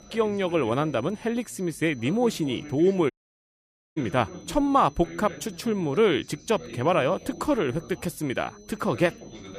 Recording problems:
background chatter; noticeable; throughout; 3 voices, 15 dB below the speech
high-pitched whine; faint; throughout; 6 kHz, 30 dB below the speech
audio cutting out; at 3 s for 1 s

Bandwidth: 15 kHz